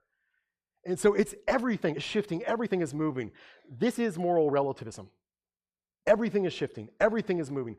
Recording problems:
uneven, jittery; slightly; from 1.5 to 5 s

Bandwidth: 15 kHz